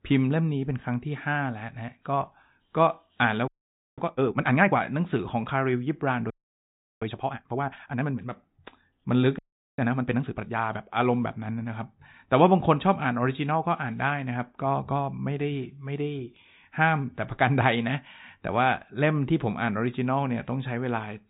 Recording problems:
high frequencies cut off; severe; nothing above 4 kHz
garbled, watery; slightly
audio freezing; at 3.5 s for 0.5 s, at 6.5 s for 0.5 s and at 9.5 s

